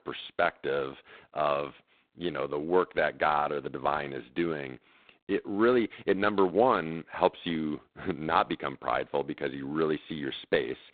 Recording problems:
phone-call audio; poor line; nothing above 4 kHz

